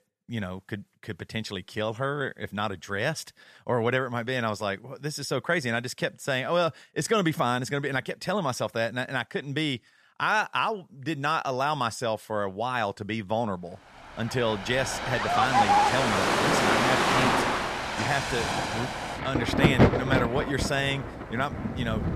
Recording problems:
rain or running water; very loud; from 14 s on; 4 dB above the speech

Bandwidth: 14.5 kHz